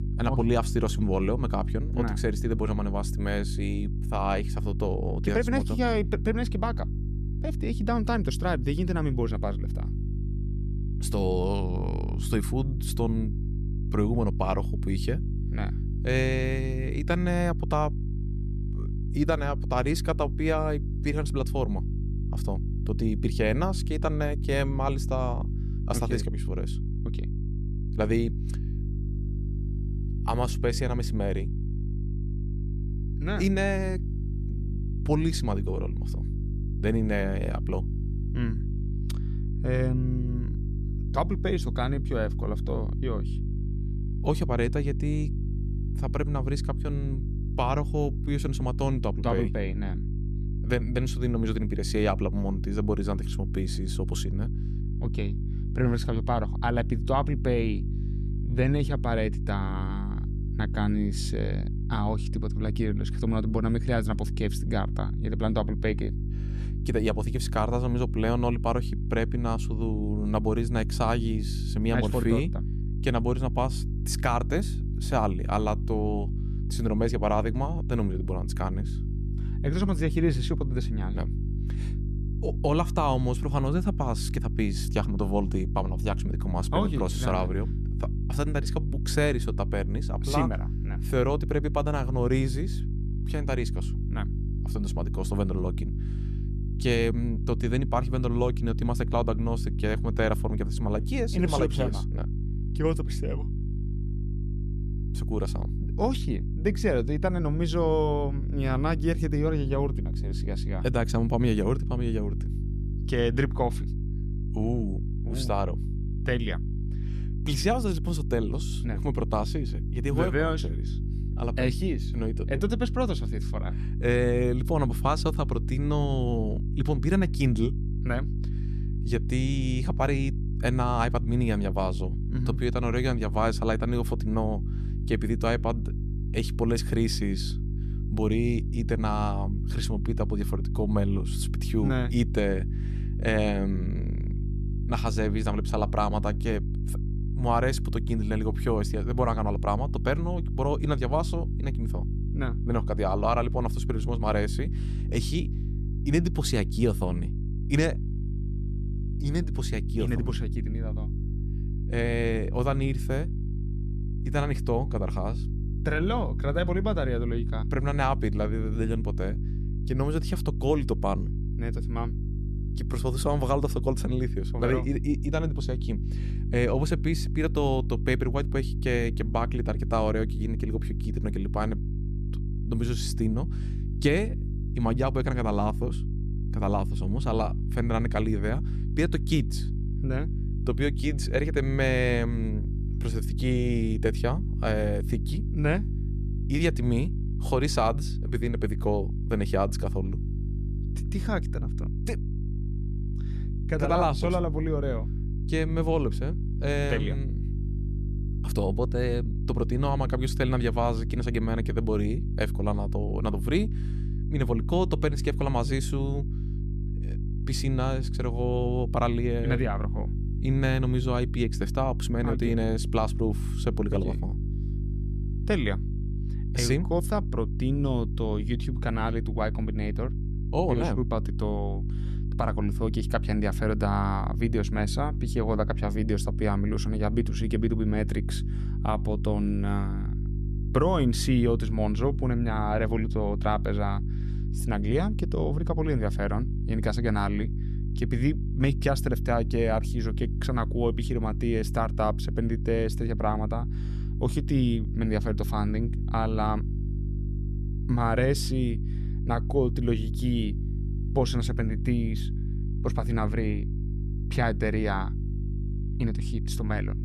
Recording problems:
electrical hum; noticeable; throughout; 50 Hz, 15 dB below the speech

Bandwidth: 13.5 kHz